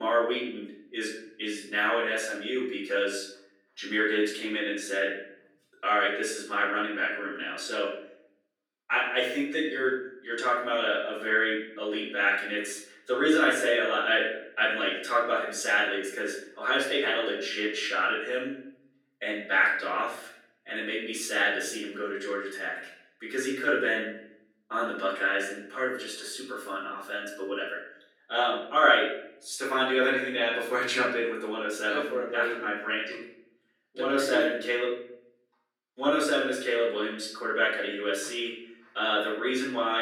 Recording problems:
off-mic speech; far
room echo; noticeable; dies away in 0.7 s
thin; somewhat; fading below 300 Hz
abrupt cut into speech; at the start and the end

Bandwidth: 17.5 kHz